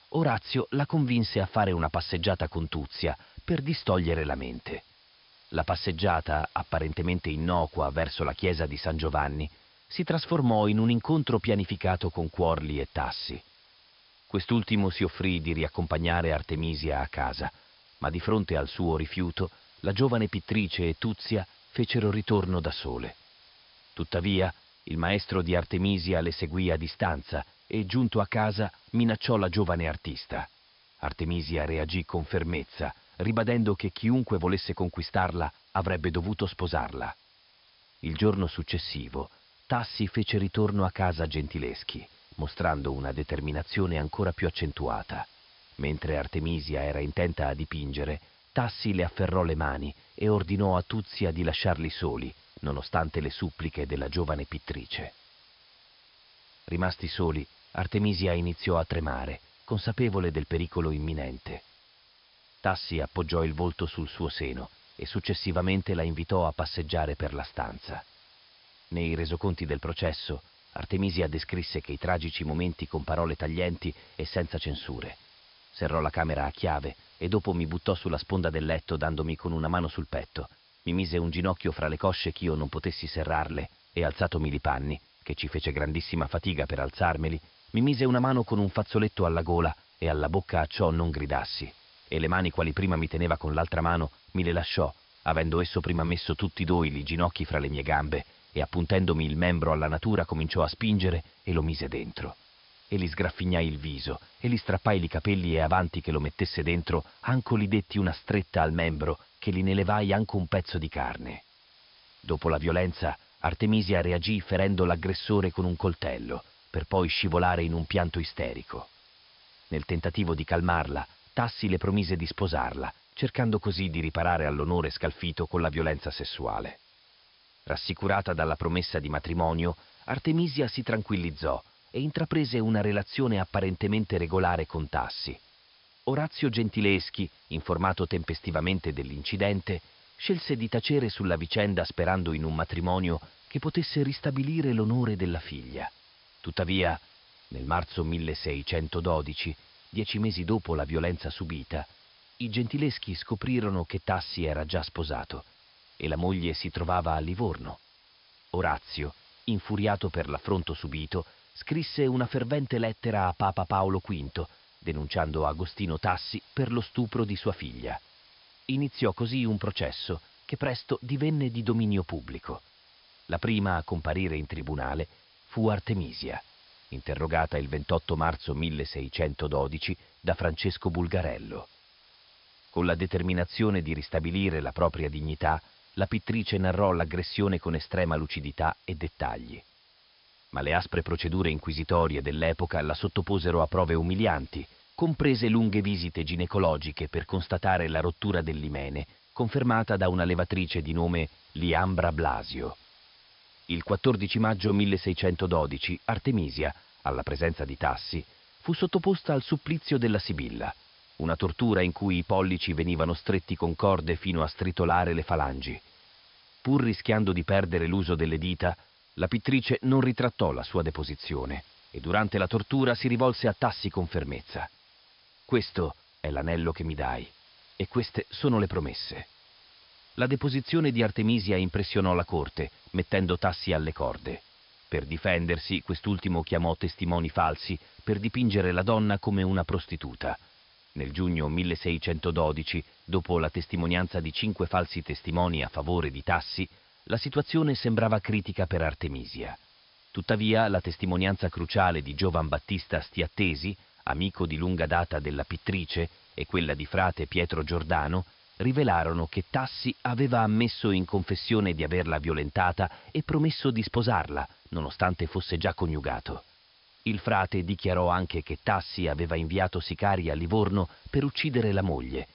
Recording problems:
high frequencies cut off; noticeable; nothing above 5.5 kHz
hiss; faint; throughout; 25 dB below the speech

